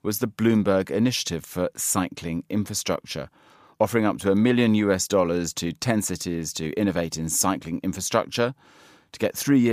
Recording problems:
abrupt cut into speech; at the end

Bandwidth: 15 kHz